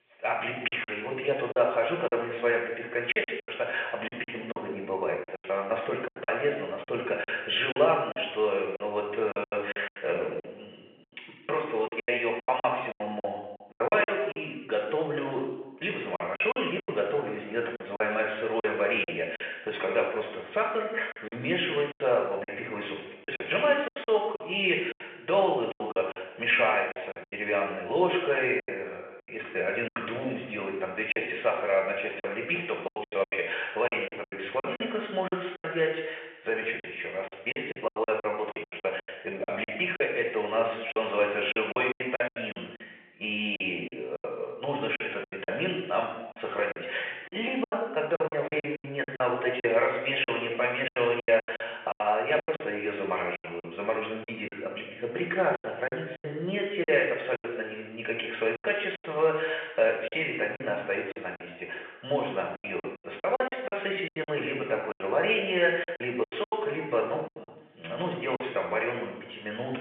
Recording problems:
off-mic speech; far
room echo; noticeable; dies away in 0.9 s
phone-call audio; nothing above 3 kHz
choppy; very; 12% of the speech affected

